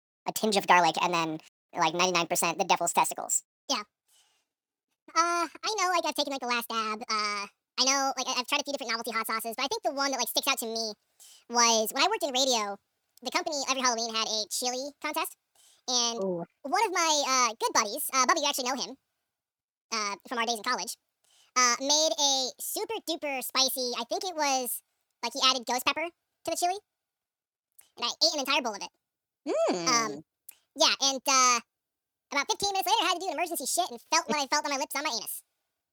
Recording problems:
wrong speed and pitch; too fast and too high; 1.7 times normal speed

